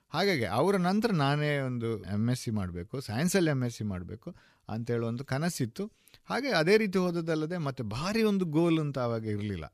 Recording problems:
none

